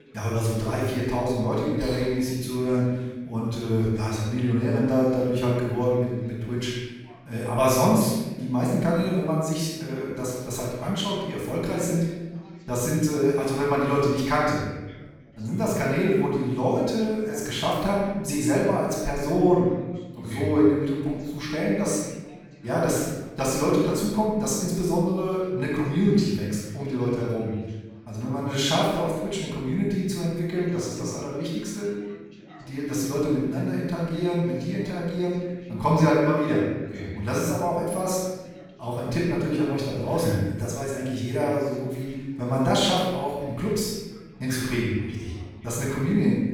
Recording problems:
room echo; strong; dies away in 1.1 s
off-mic speech; far
background chatter; faint; throughout; 4 voices, 25 dB below the speech

